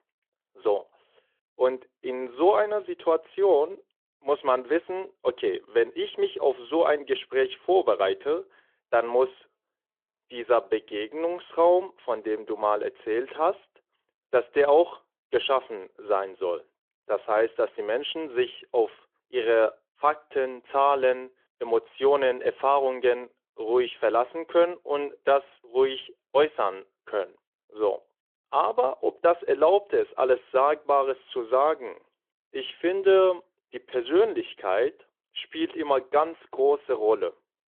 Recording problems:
phone-call audio

